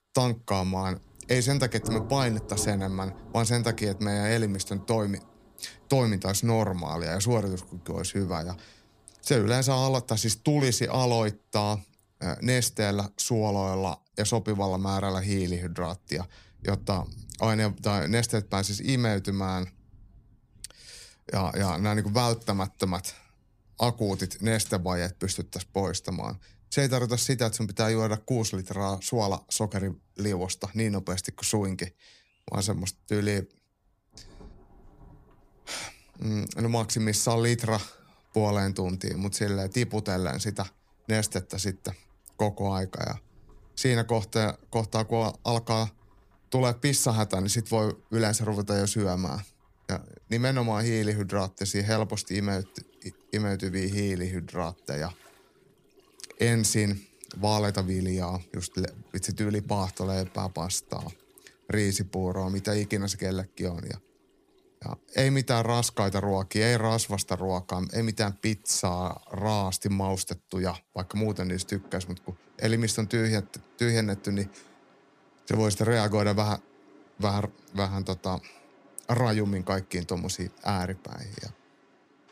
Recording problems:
rain or running water; faint; throughout; 20 dB below the speech

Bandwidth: 15 kHz